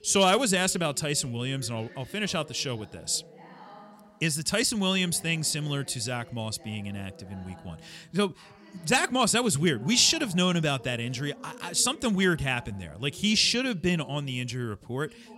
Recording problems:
voice in the background; faint; throughout; 20 dB below the speech

